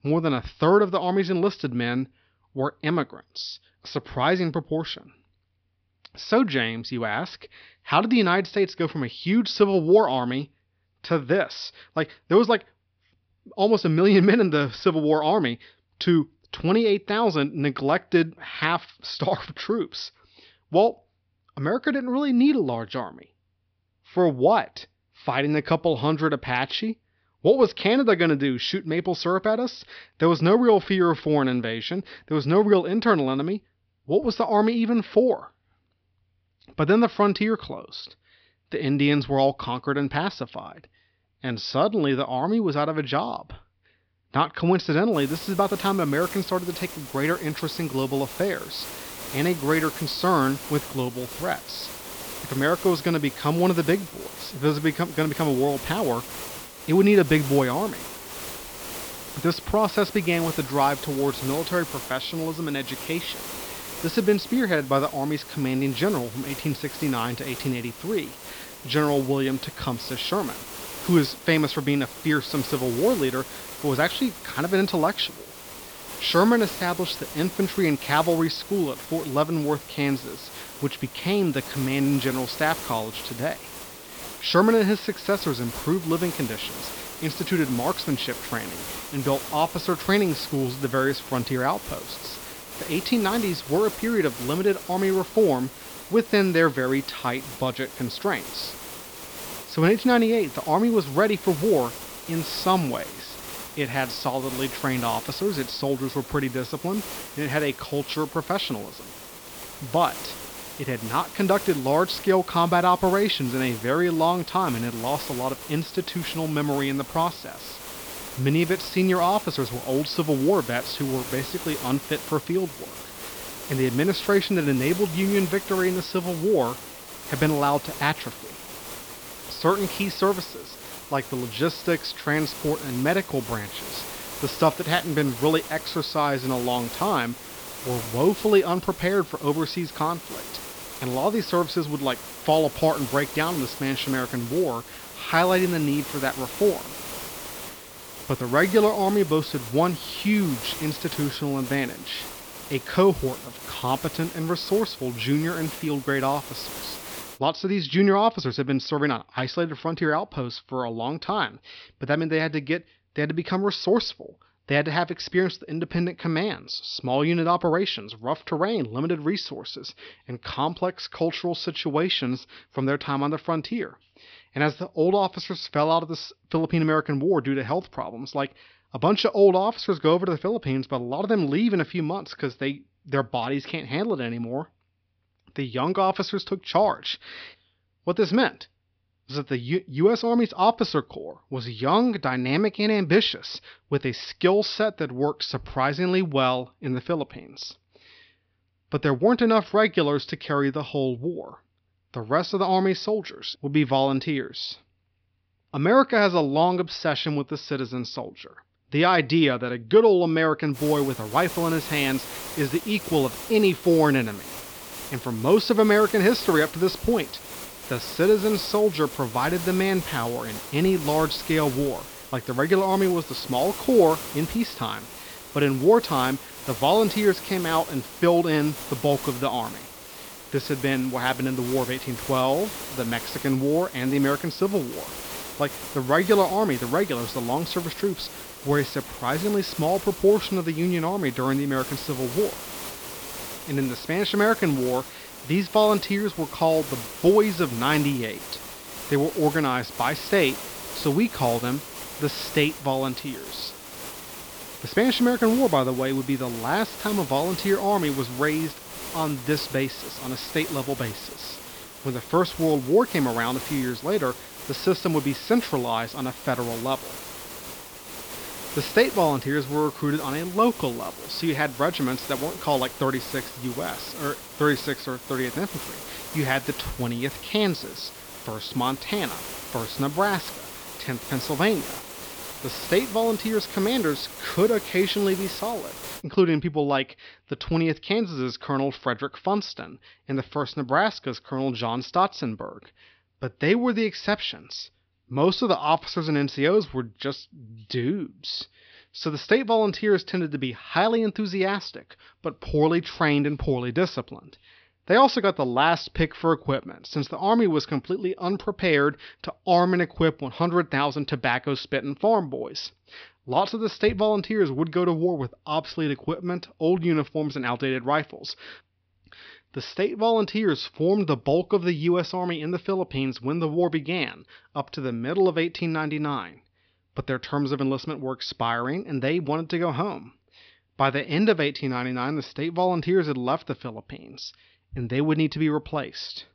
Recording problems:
high frequencies cut off; noticeable; nothing above 5.5 kHz
hiss; noticeable; from 45 s to 2:37 and from 3:31 to 4:46; 10 dB below the speech

